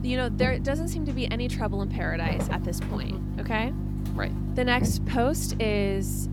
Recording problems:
electrical hum; loud; throughout; 50 Hz, 9 dB below the speech

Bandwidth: 17.5 kHz